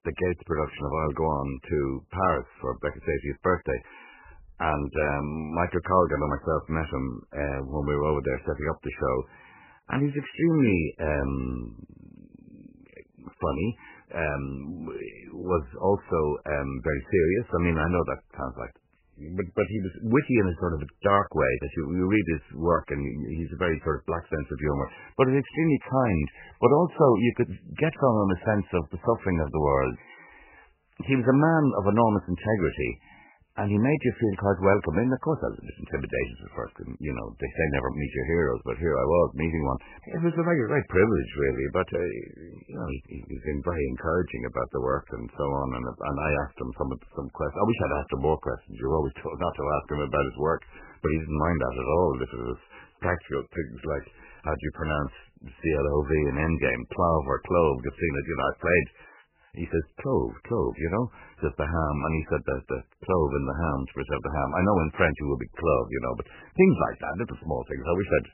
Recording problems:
garbled, watery; badly; nothing above 3 kHz

